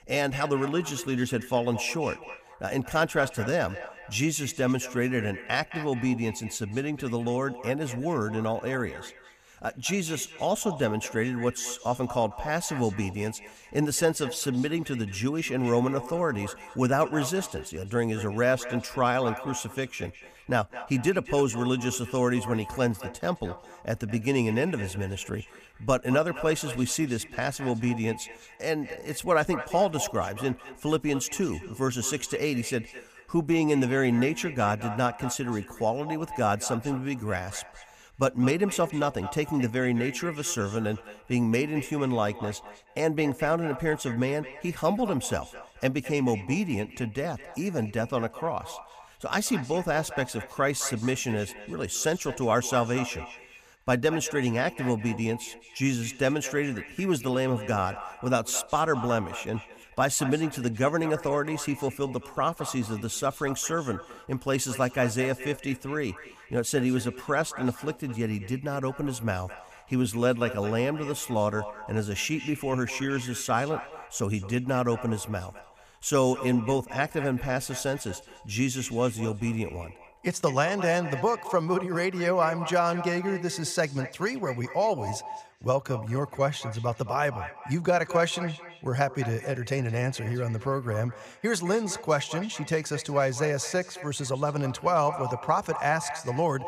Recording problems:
echo of what is said; noticeable; throughout; 210 ms later, 15 dB below the speech

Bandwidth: 15 kHz